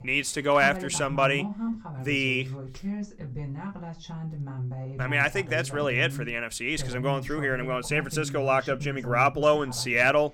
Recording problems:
voice in the background; loud; throughout; 10 dB below the speech

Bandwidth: 18 kHz